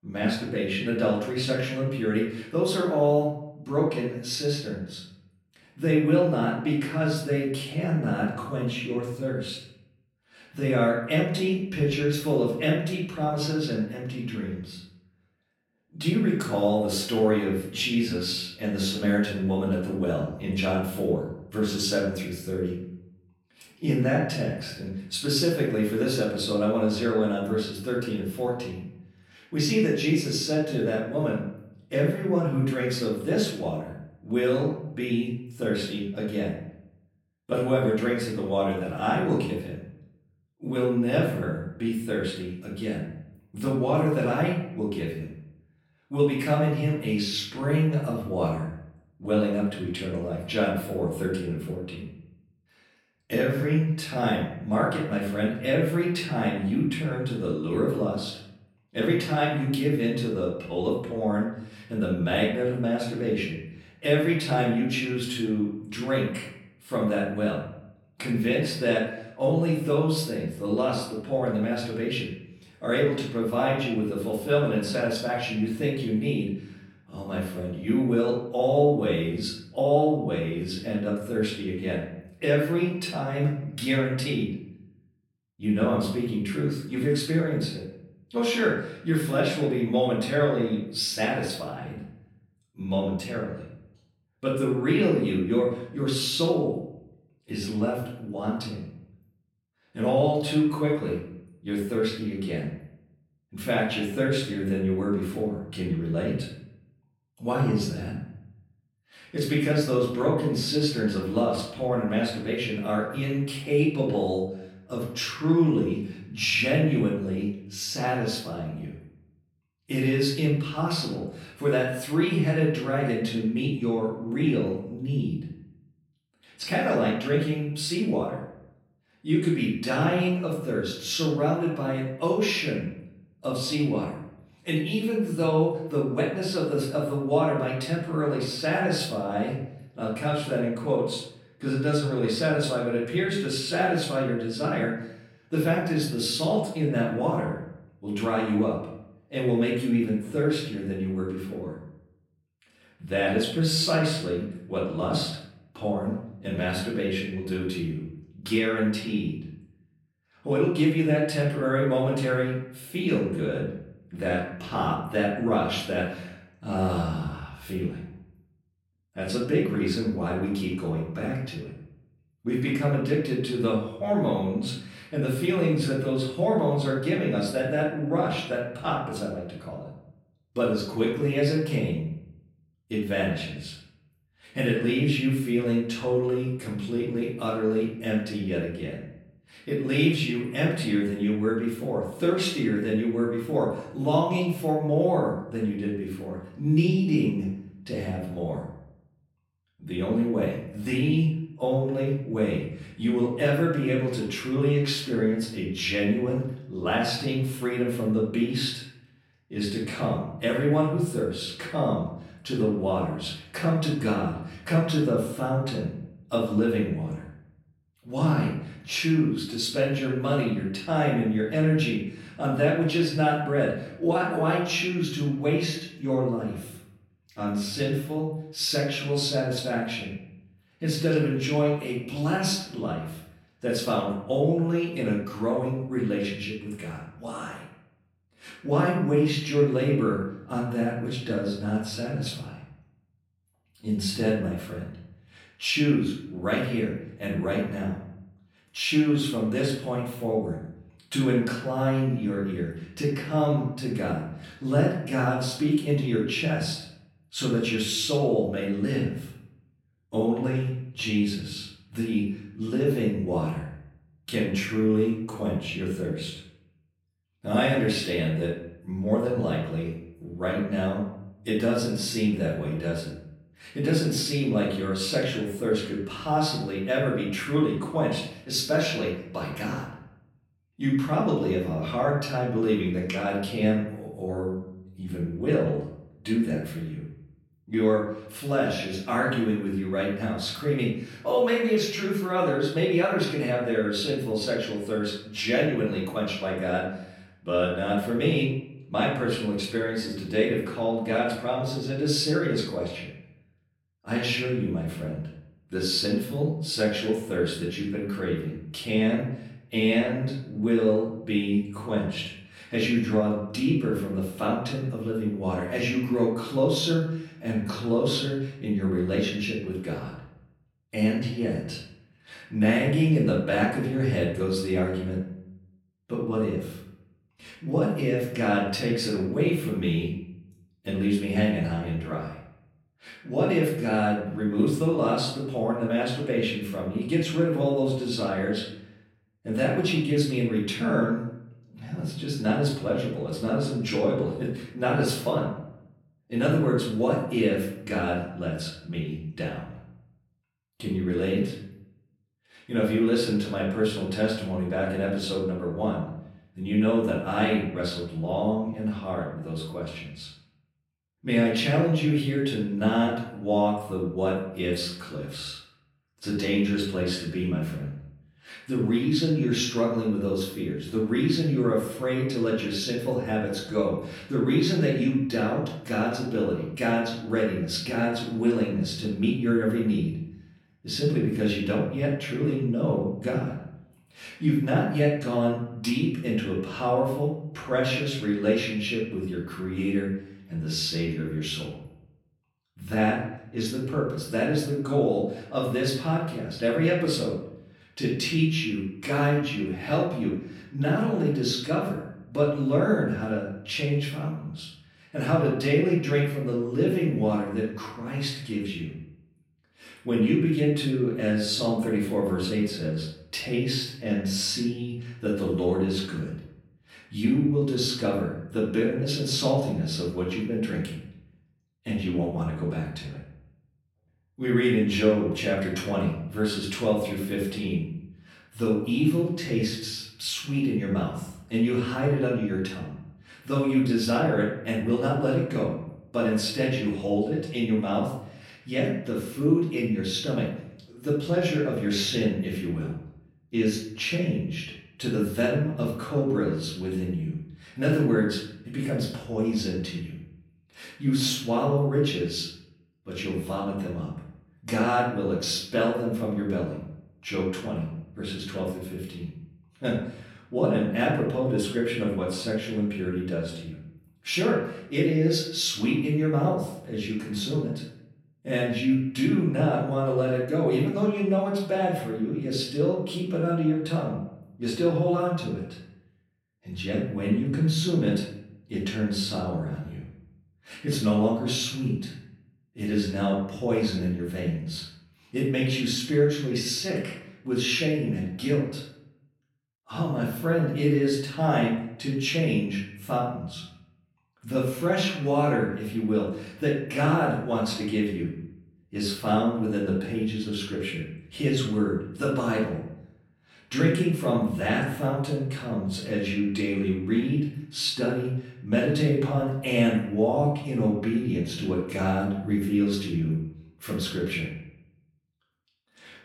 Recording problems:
off-mic speech; far
room echo; noticeable; dies away in 0.7 s

